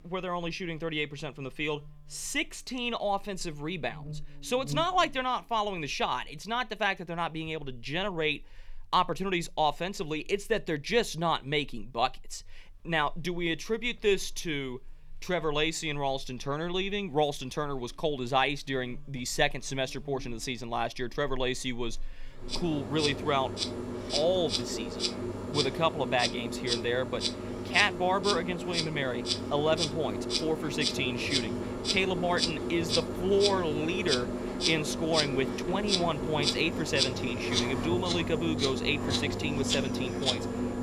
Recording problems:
animal sounds; loud; throughout; 1 dB below the speech

